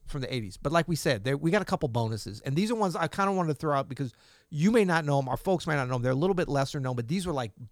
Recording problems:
none

